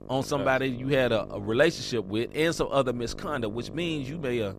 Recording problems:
electrical hum; noticeable; throughout; 50 Hz, 20 dB below the speech

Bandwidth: 14.5 kHz